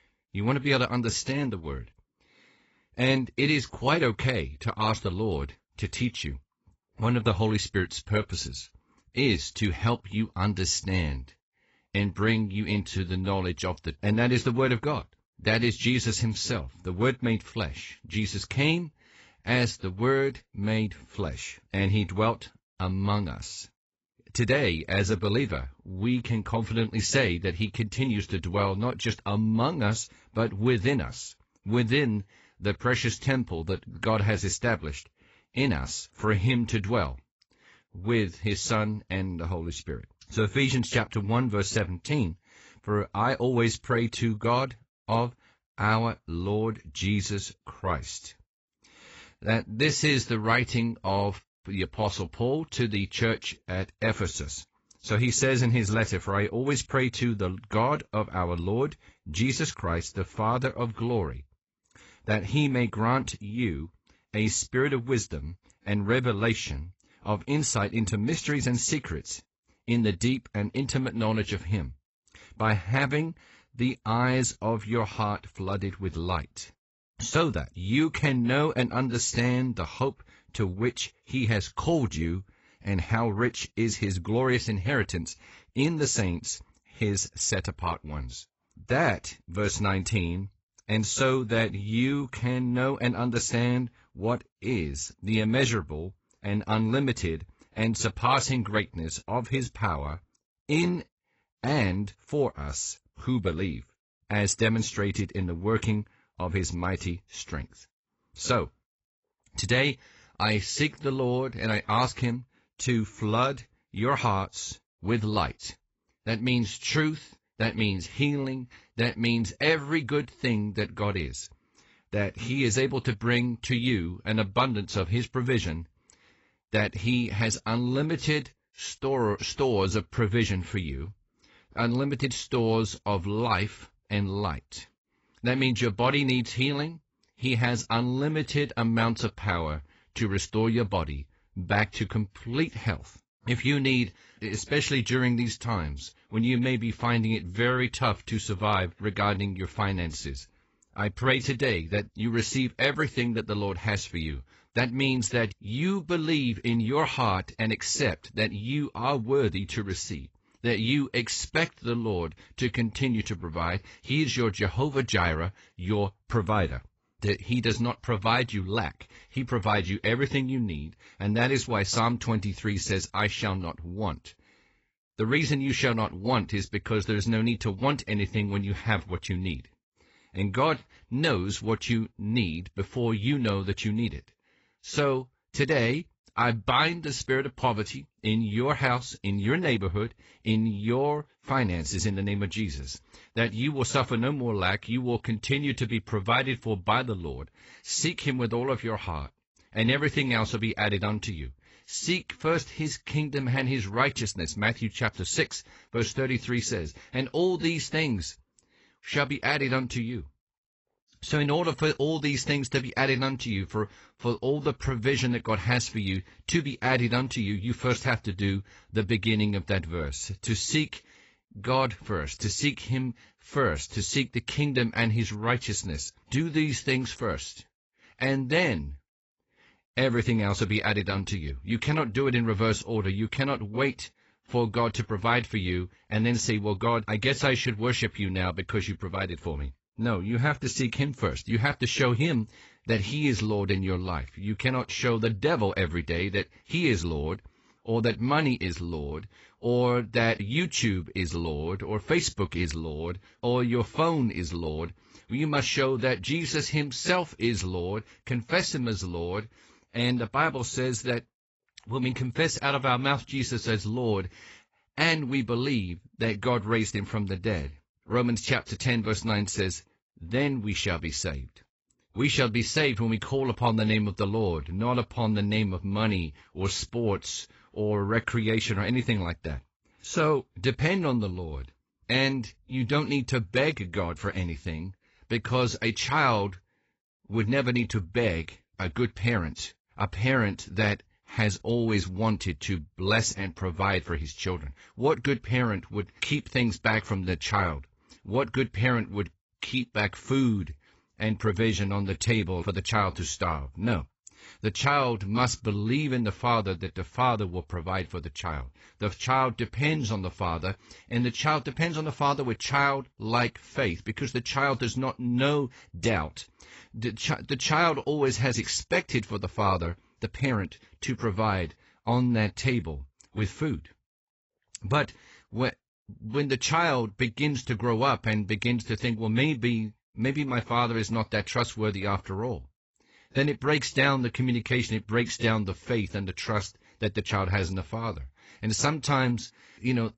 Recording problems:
garbled, watery; badly; nothing above 8 kHz

